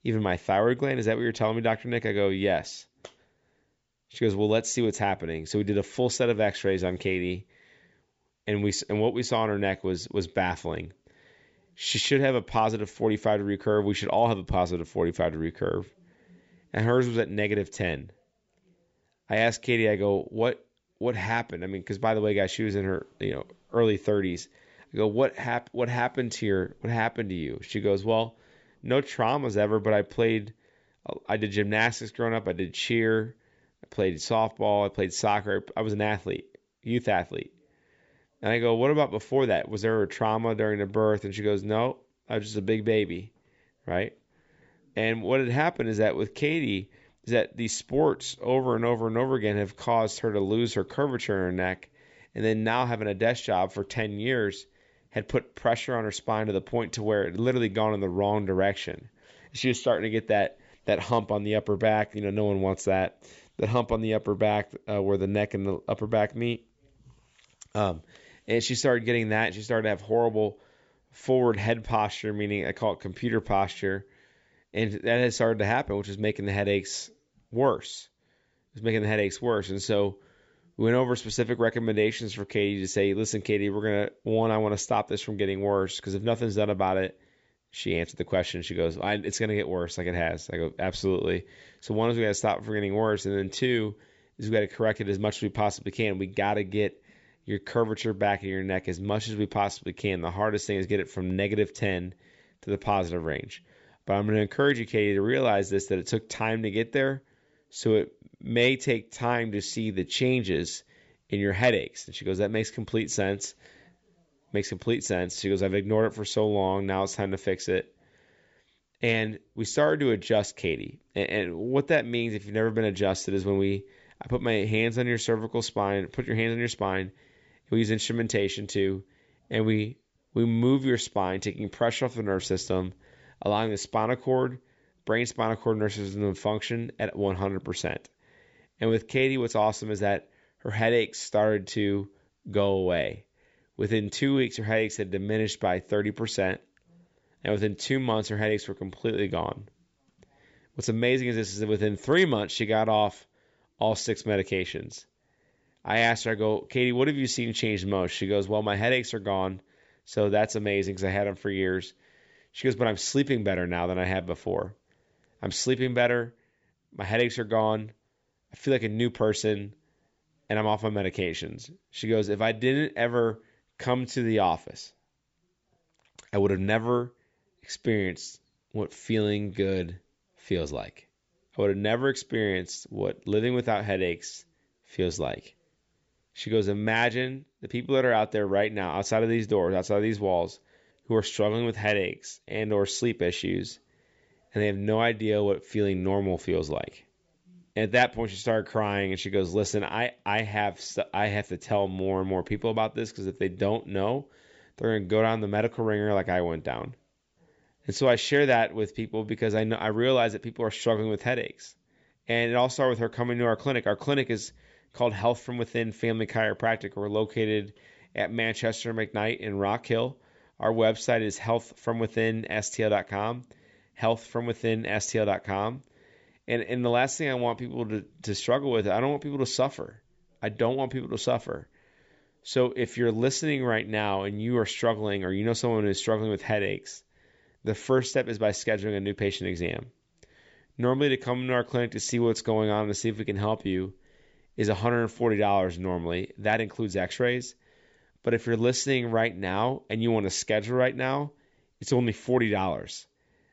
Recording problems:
high frequencies cut off; noticeable; nothing above 8 kHz

